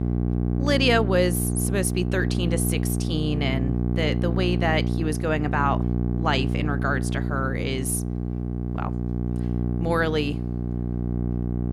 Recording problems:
electrical hum; loud; throughout; 60 Hz, 8 dB below the speech

